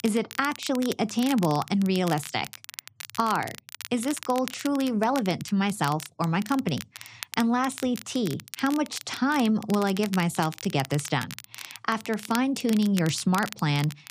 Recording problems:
crackle, like an old record; noticeable; 15 dB below the speech

